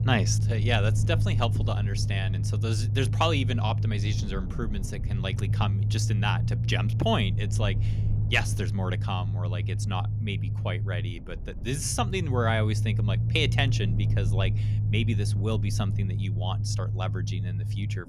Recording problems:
low rumble; loud; throughout; 10 dB below the speech

